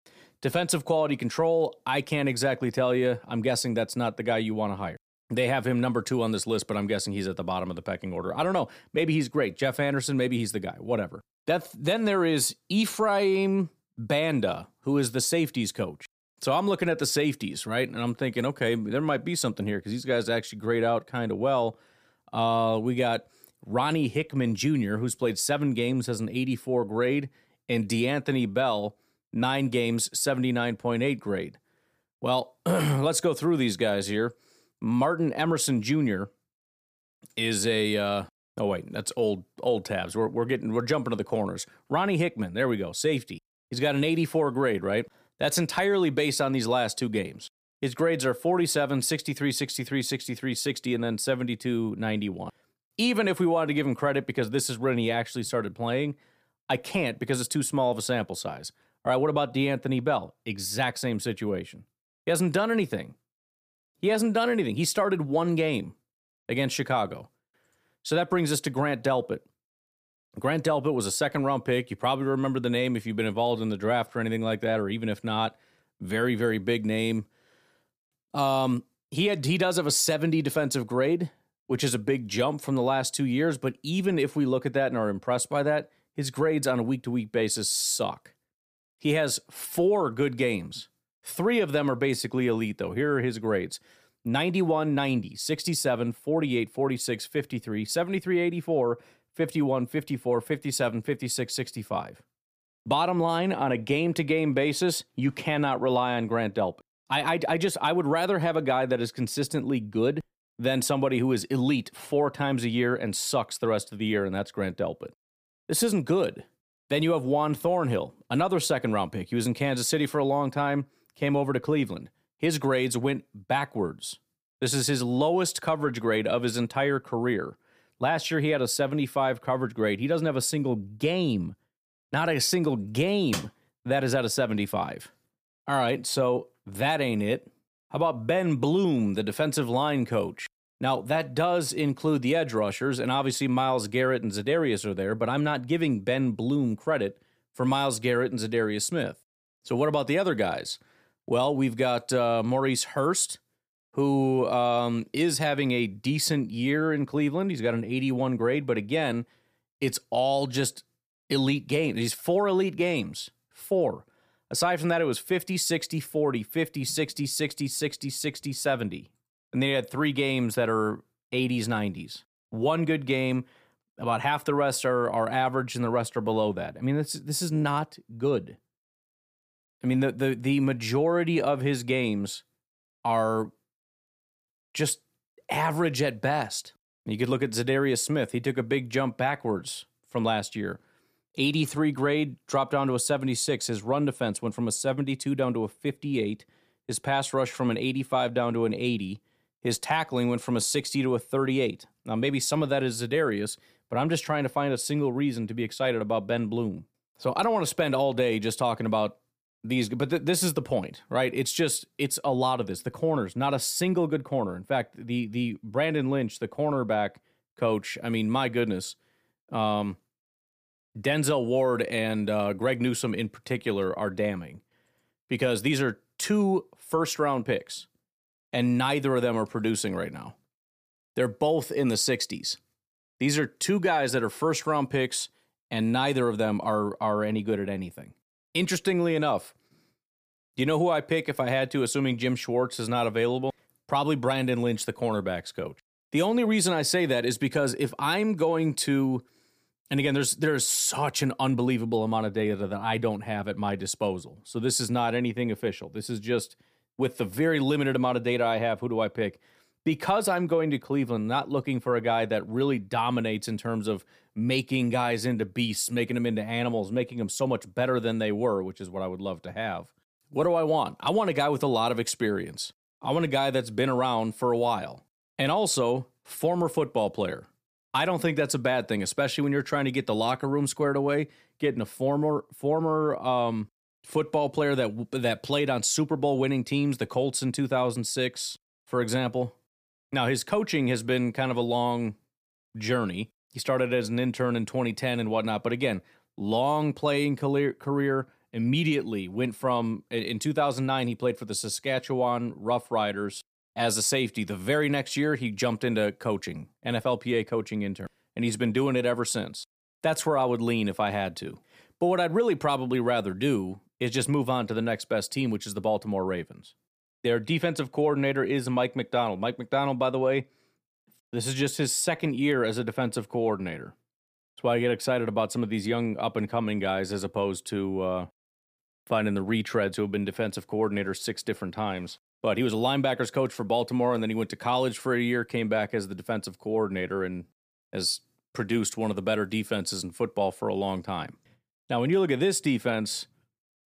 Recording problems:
none

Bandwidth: 15 kHz